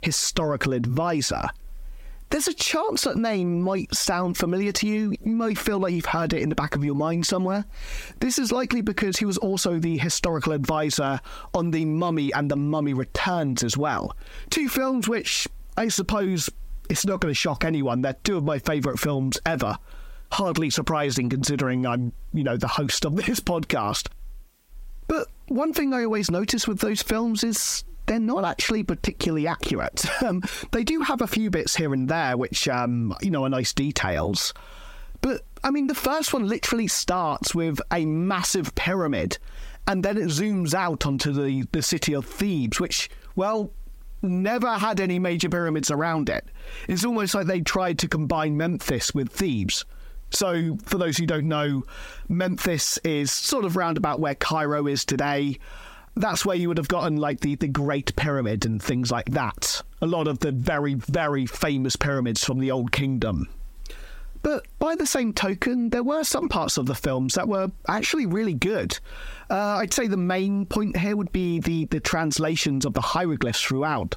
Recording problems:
squashed, flat; heavily

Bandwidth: 16 kHz